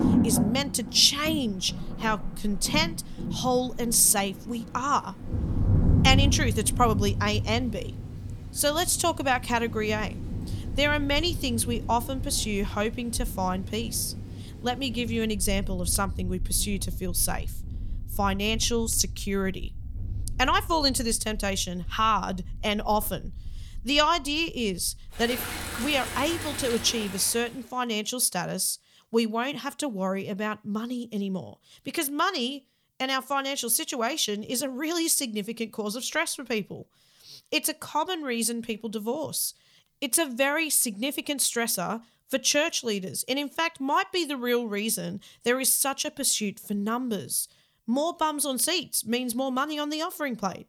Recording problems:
rain or running water; loud; until 27 s; 7 dB below the speech

